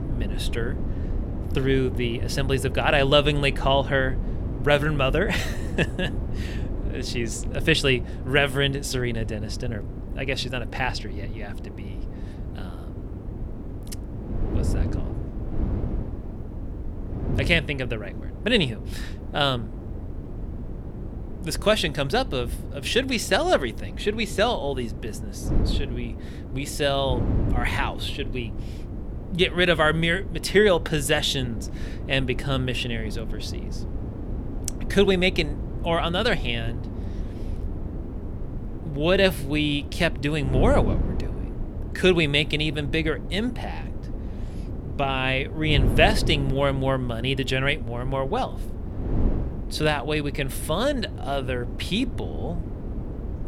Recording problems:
wind noise on the microphone; occasional gusts; 15 dB below the speech

